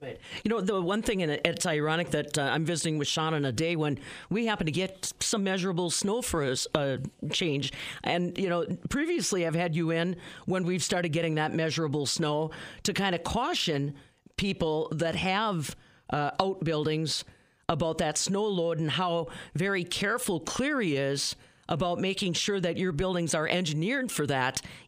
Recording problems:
squashed, flat; heavily

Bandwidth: 15 kHz